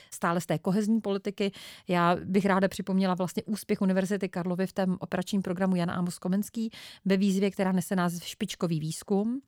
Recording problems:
none

